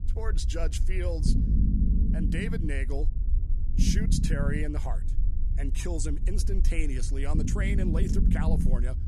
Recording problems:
low rumble; loud; throughout; 4 dB below the speech

